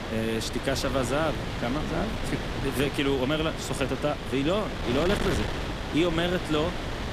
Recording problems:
wind noise on the microphone; heavy; 4 dB below the speech

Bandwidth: 14.5 kHz